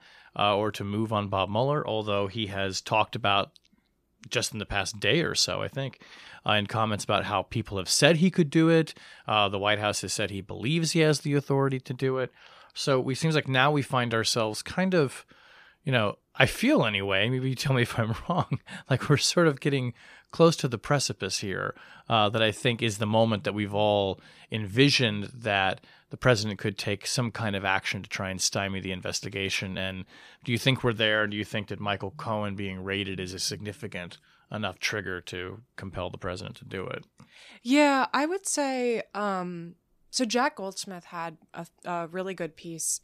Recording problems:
none

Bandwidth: 14.5 kHz